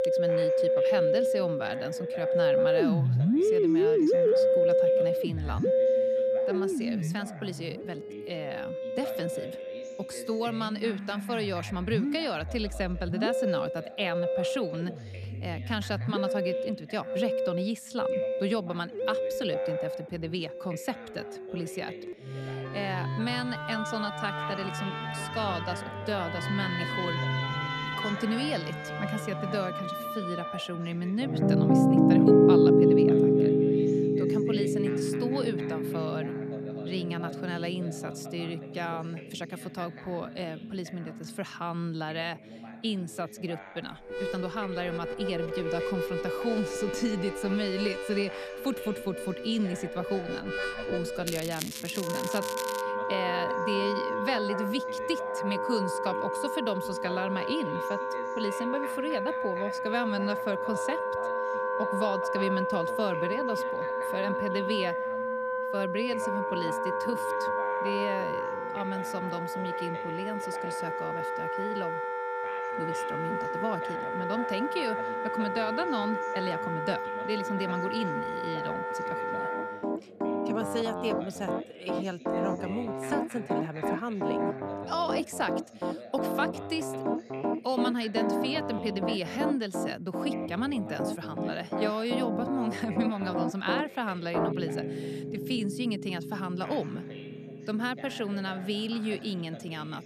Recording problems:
background music; very loud; throughout; 4 dB above the speech
crackling; loud; from 51 to 53 s; 4 dB below the speech
voice in the background; noticeable; throughout; 15 dB below the speech
uneven, jittery; slightly; from 24 s to 1:36

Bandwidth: 14 kHz